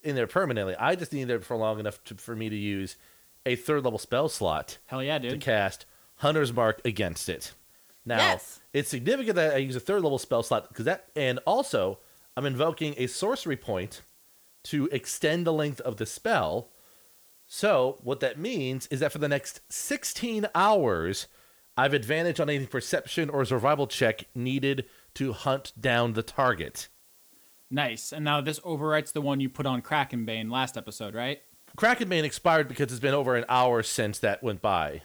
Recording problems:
hiss; faint; throughout; 30 dB below the speech

